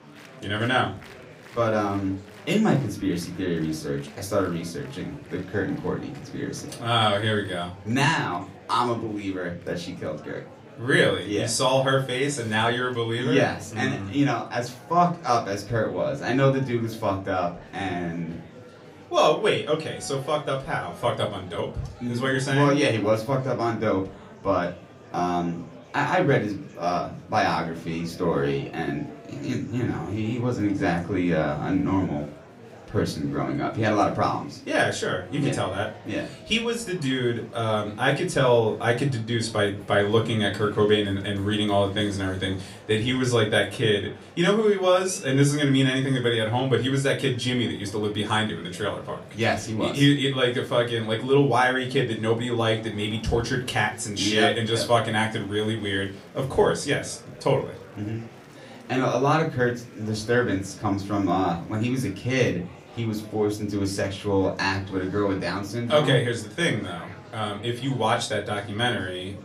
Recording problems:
off-mic speech; far
room echo; very slight; dies away in 0.3 s
murmuring crowd; faint; throughout; 20 dB below the speech

